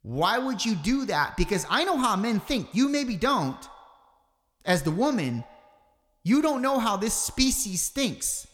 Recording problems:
echo of what is said; faint; throughout; 140 ms later, 25 dB below the speech

